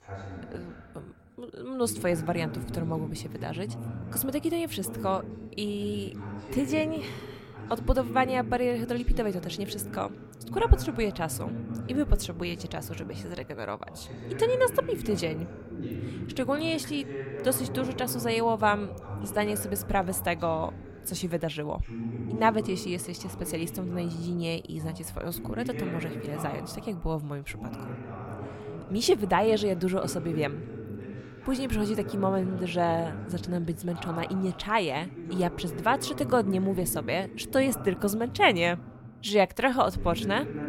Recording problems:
voice in the background; loud; throughout; 10 dB below the speech

